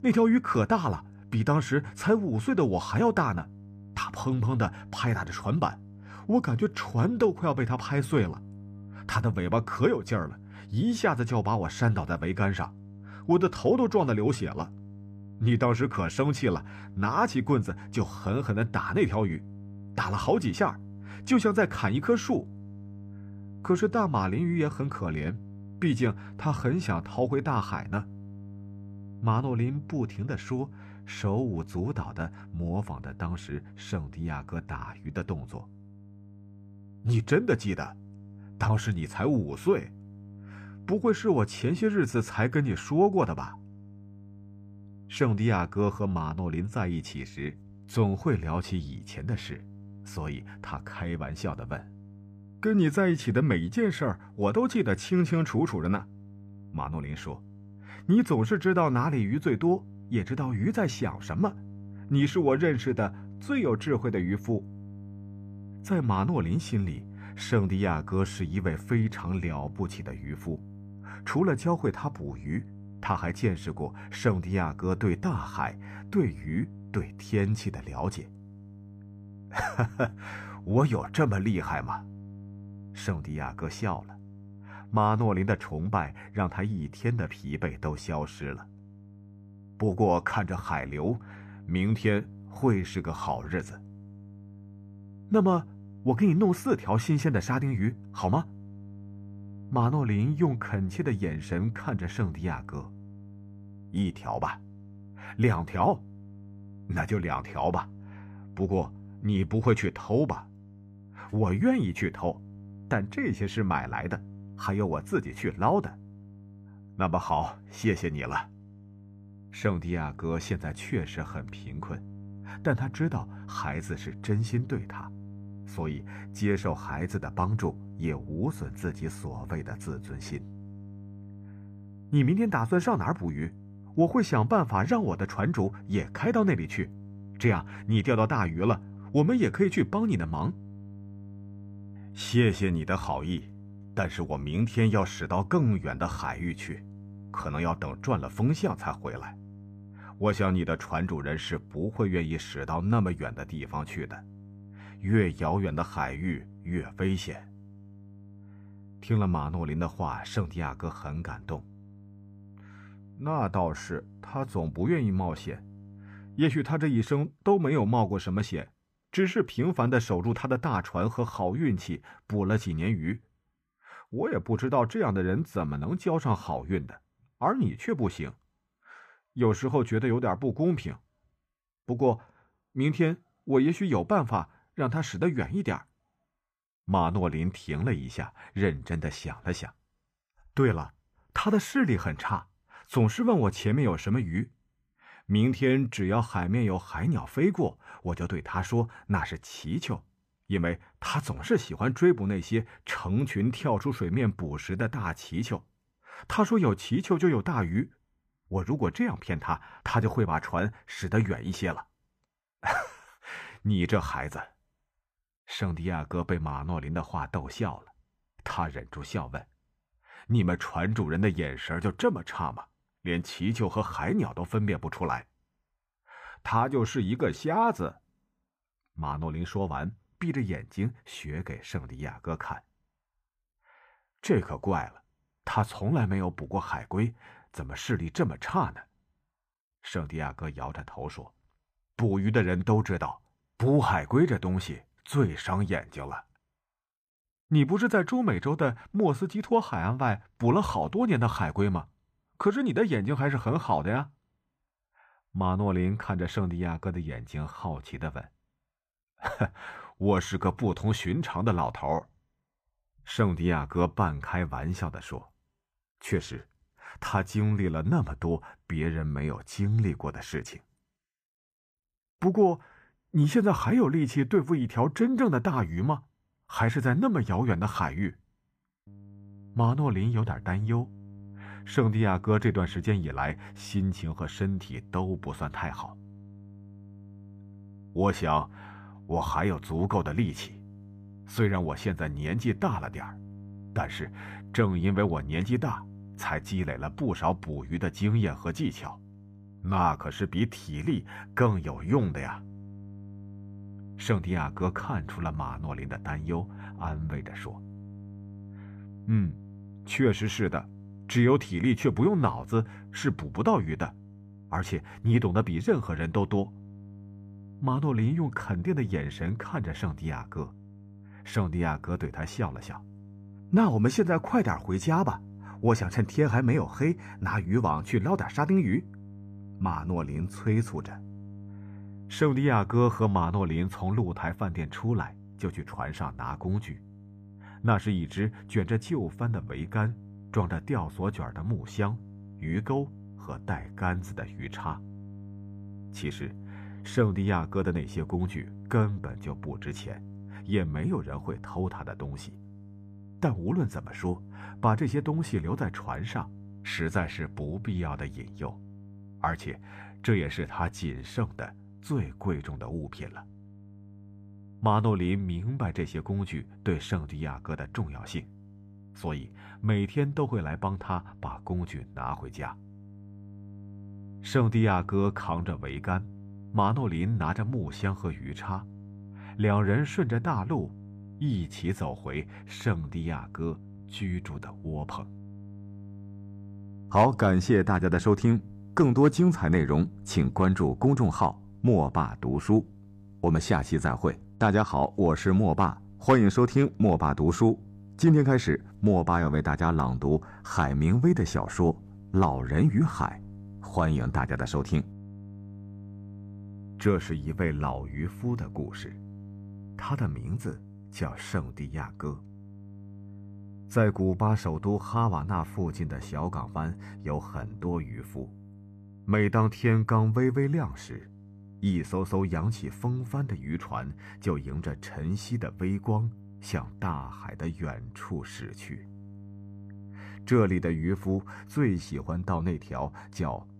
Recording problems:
electrical hum; faint; until 2:46 and from 4:39 on; 50 Hz, 25 dB below the speech

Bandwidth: 14.5 kHz